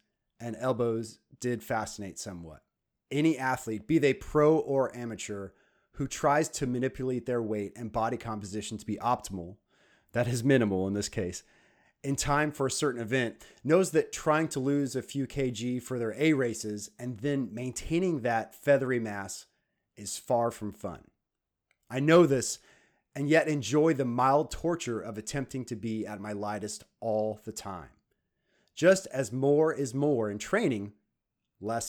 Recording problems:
abrupt cut into speech; at the end

